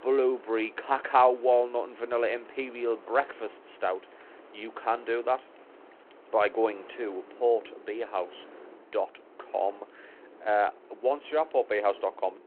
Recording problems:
phone-call audio
wind in the background; faint; throughout; 20 dB below the speech

